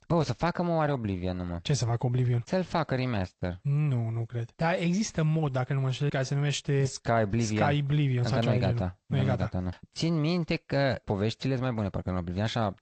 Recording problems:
garbled, watery; slightly; nothing above 8 kHz

